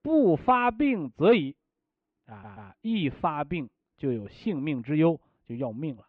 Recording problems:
muffled; very; fading above 2.5 kHz
audio stuttering; at 2.5 s

